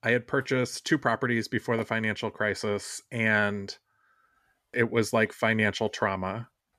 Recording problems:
none

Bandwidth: 14.5 kHz